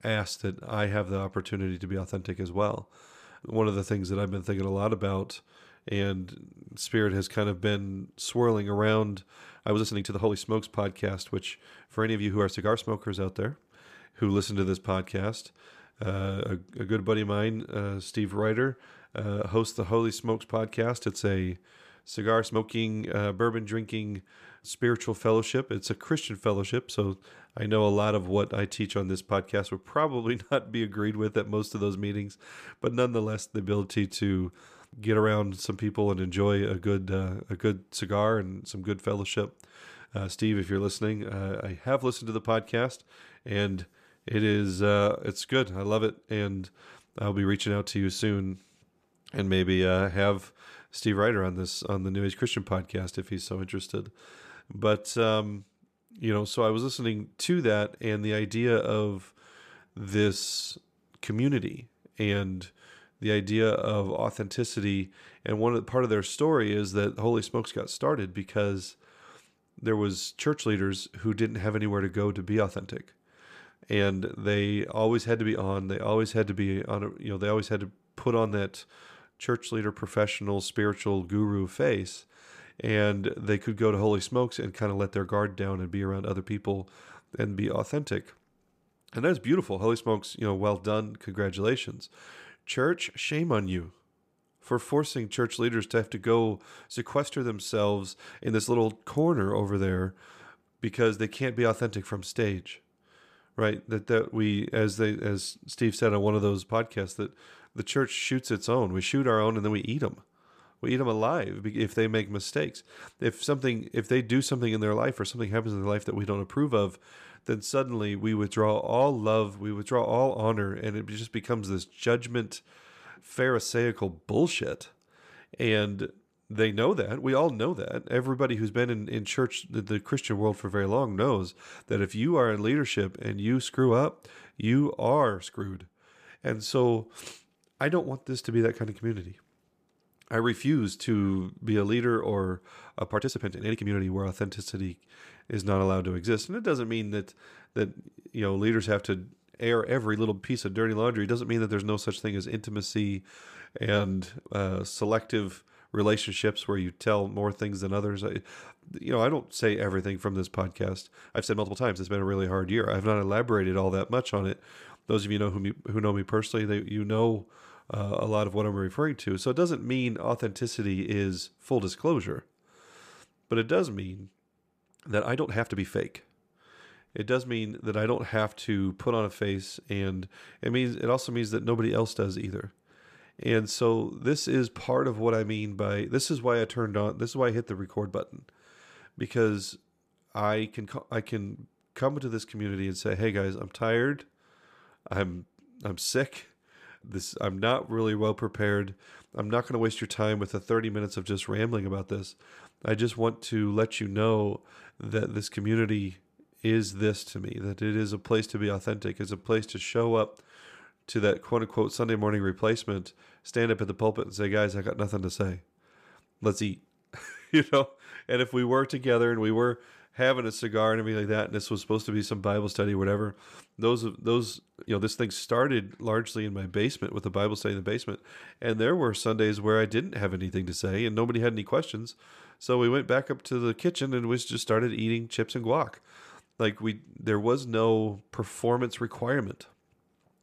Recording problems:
uneven, jittery; strongly; from 9.5 s to 3:49

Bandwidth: 14.5 kHz